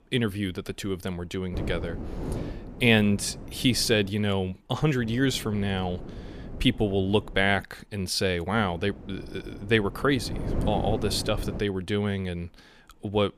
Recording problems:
wind noise on the microphone; occasional gusts; from 1.5 to 4 s, from 5 to 7.5 s and from 8.5 to 12 s; 15 dB below the speech

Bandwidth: 15 kHz